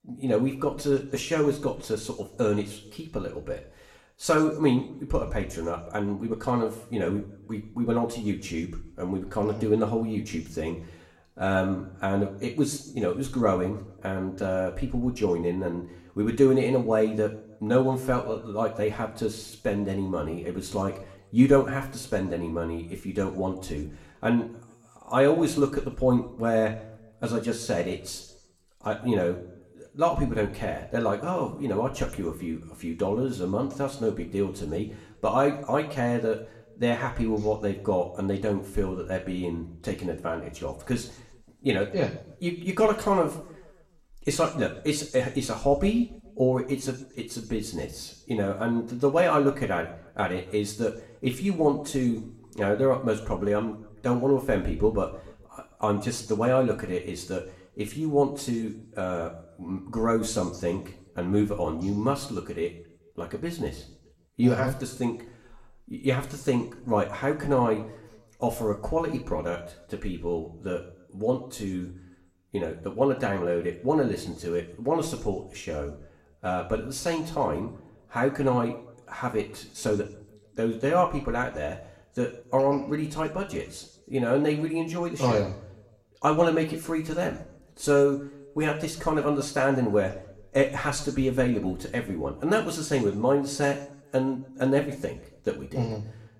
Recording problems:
room echo; slight; dies away in 0.6 s
off-mic speech; somewhat distant

